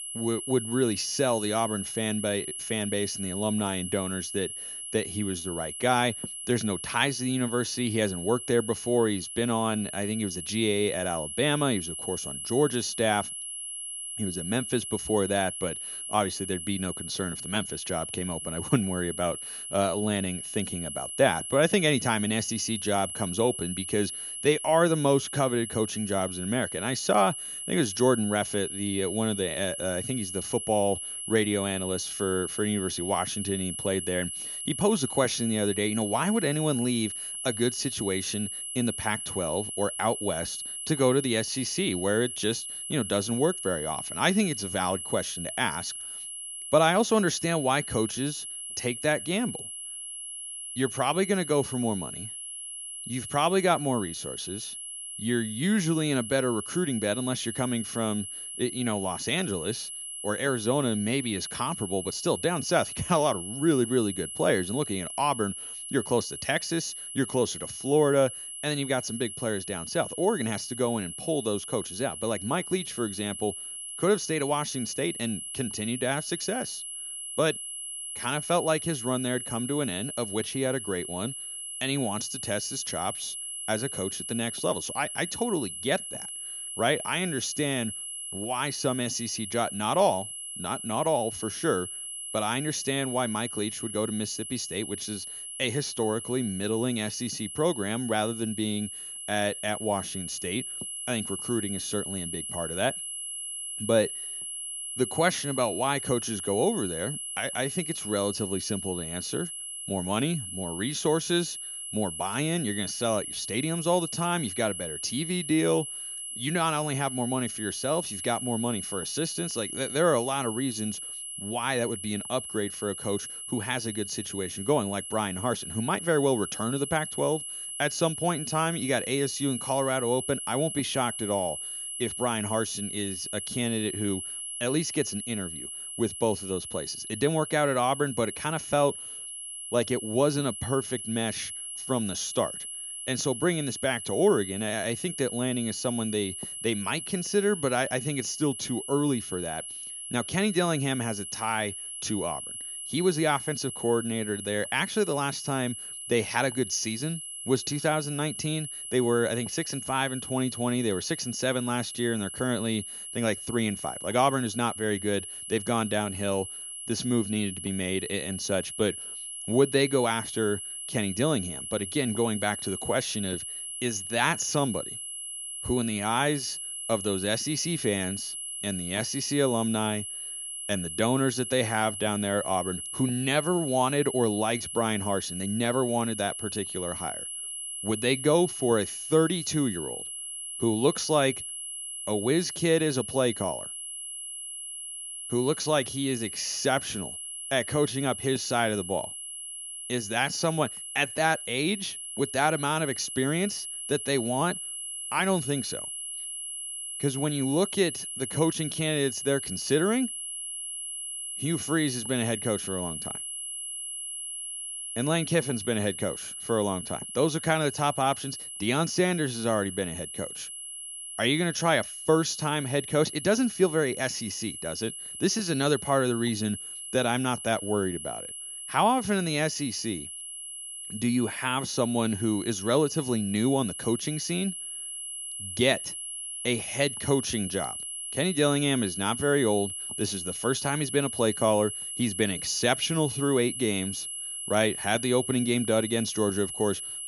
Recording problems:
high-pitched whine; loud; throughout; 11 kHz, 6 dB below the speech

